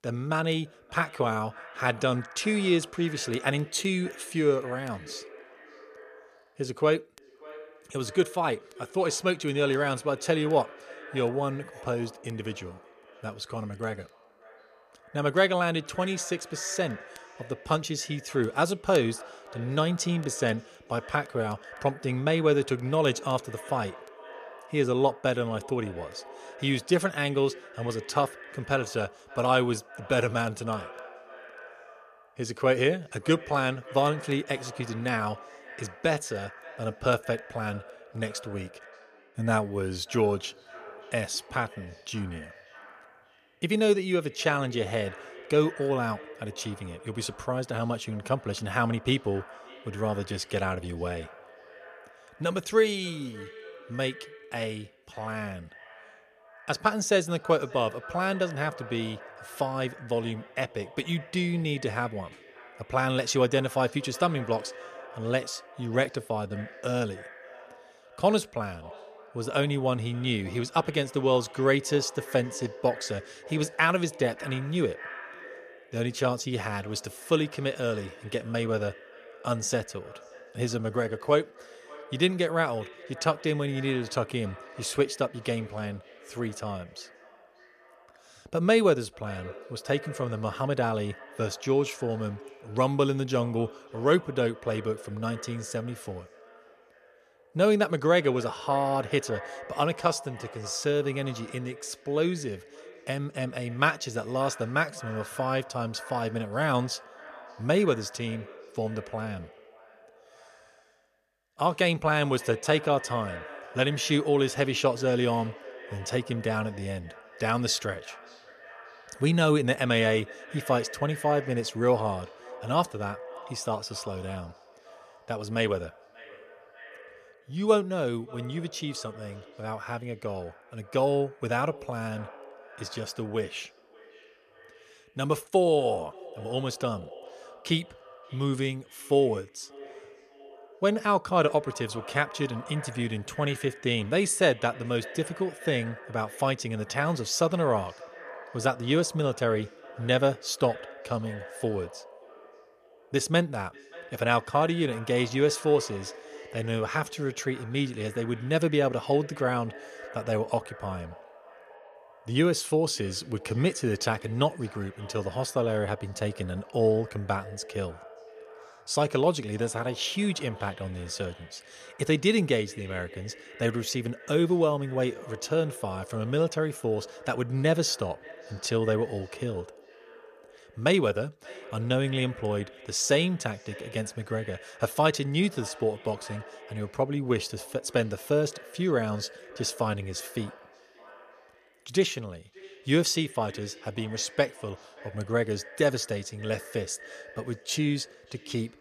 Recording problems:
echo of what is said; noticeable; throughout; 580 ms later, 20 dB below the speech

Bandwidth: 14.5 kHz